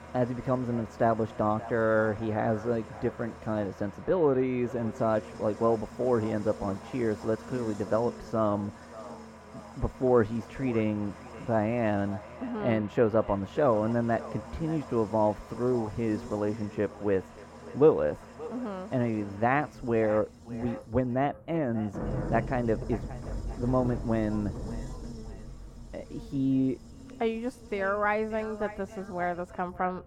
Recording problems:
muffled; very; fading above 2.5 kHz
echo of what is said; faint; throughout; 580 ms later, 20 dB below the speech
traffic noise; noticeable; throughout; 15 dB below the speech
electrical hum; faint; throughout; 60 Hz, 25 dB below the speech

